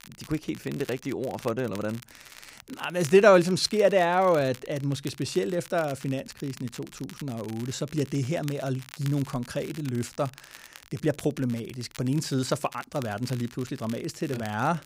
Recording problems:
crackle, like an old record; noticeable; 20 dB below the speech

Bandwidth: 15.5 kHz